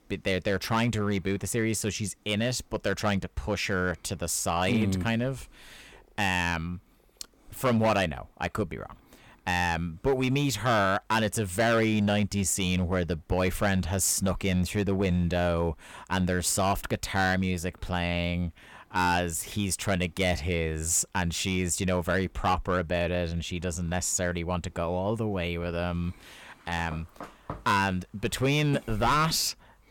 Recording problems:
distortion; slight; 4% of the sound clipped

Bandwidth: 17.5 kHz